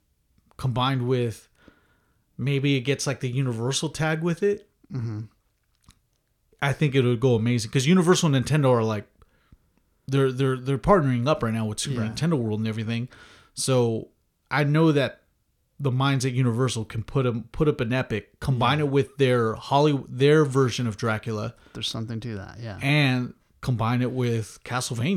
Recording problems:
abrupt cut into speech; at the end

